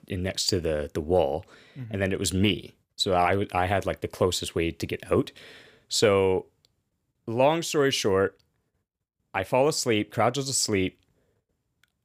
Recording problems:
none

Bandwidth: 15 kHz